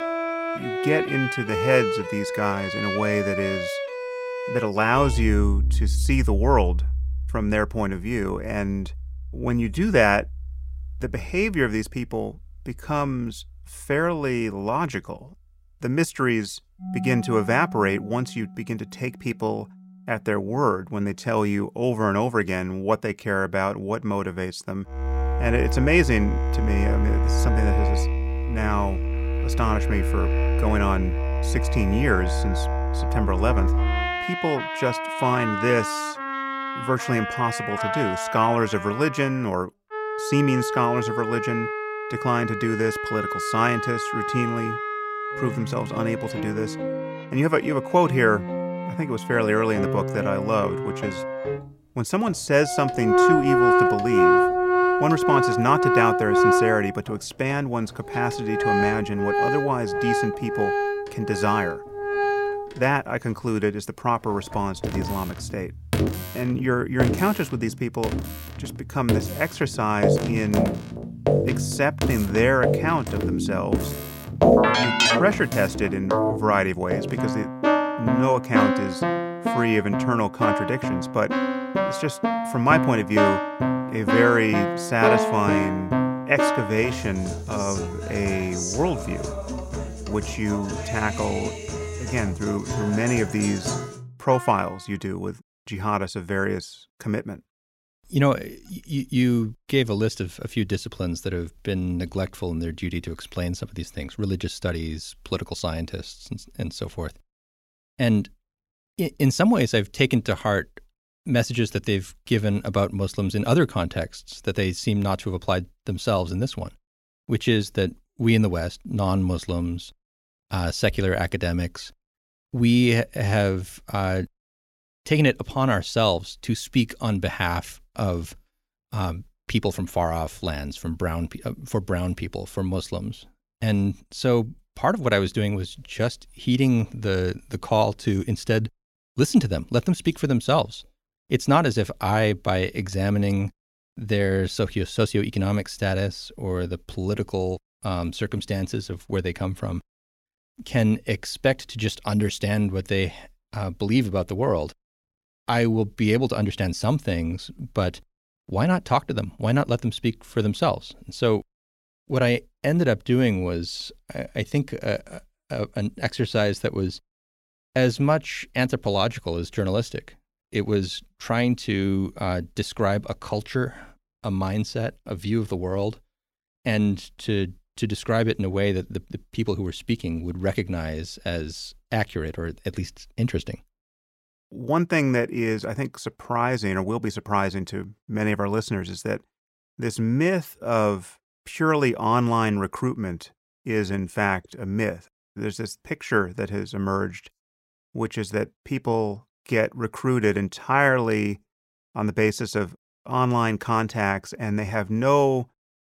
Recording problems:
background music; loud; until 1:34; as loud as the speech

